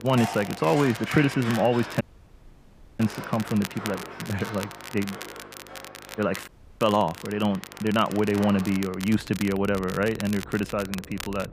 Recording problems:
muffled; slightly; fading above 3 kHz
animal sounds; noticeable; throughout; 15 dB below the speech
crackle, like an old record; noticeable; 15 dB below the speech
electrical hum; faint; throughout; 50 Hz, 25 dB below the speech
audio cutting out; at 2 s for 1 s and at 6.5 s

